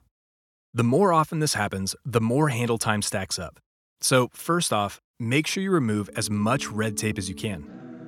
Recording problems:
background music; noticeable; from 6.5 s on; 15 dB below the speech

